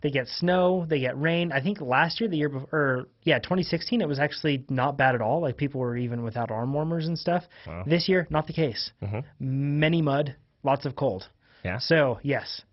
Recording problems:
garbled, watery; badly; nothing above 5.5 kHz

